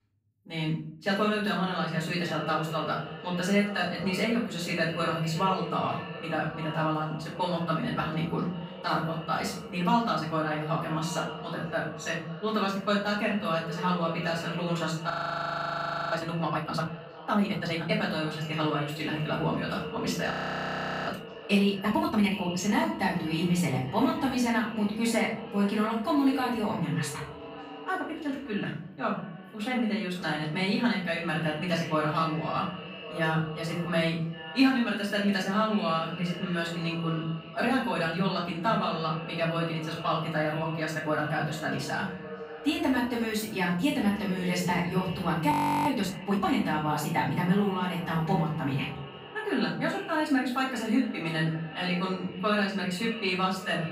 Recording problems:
off-mic speech; far
echo of what is said; noticeable; throughout; 550 ms later, 15 dB below the speech
room echo; noticeable; dies away in 0.7 s
audio freezing; at 15 s for 1 s, at 20 s for 1 s and at 46 s

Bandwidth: 15.5 kHz